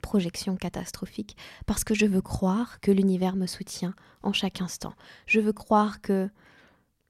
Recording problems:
none

